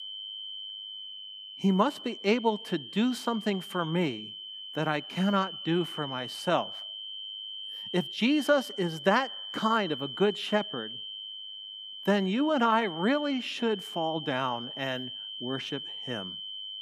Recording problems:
high-pitched whine; loud; throughout; 3 kHz, 9 dB below the speech

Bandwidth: 15 kHz